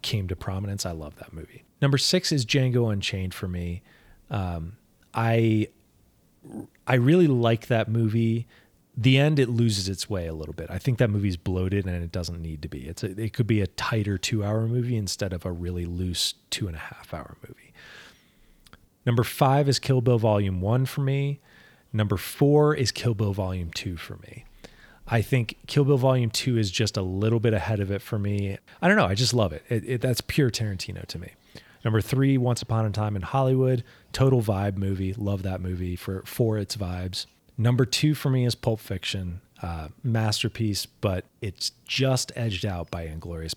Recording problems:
none

